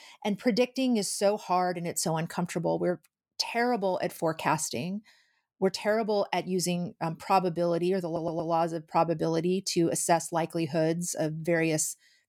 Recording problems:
audio stuttering; at 8 s

